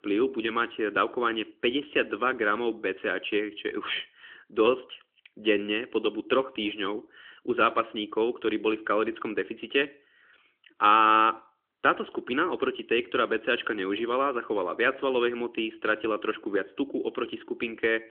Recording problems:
phone-call audio; nothing above 3.5 kHz

